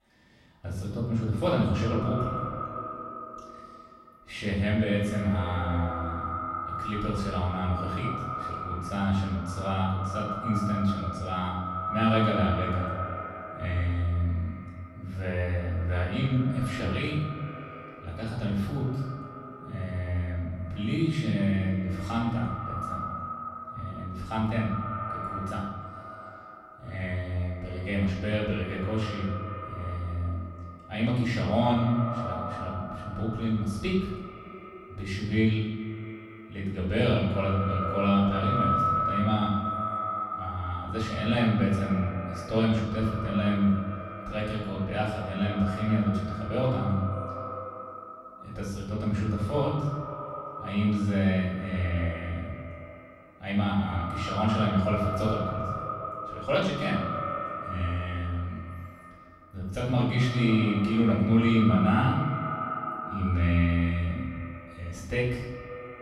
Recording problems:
echo of what is said; strong; throughout; 120 ms later, 7 dB below the speech
off-mic speech; far
room echo; noticeable; dies away in 0.9 s

